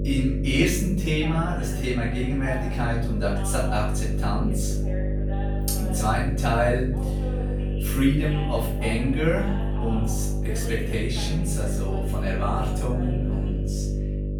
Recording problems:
off-mic speech; far
room echo; noticeable; dies away in 0.5 s
electrical hum; loud; throughout; 50 Hz, 9 dB below the speech
voice in the background; noticeable; throughout; 15 dB below the speech

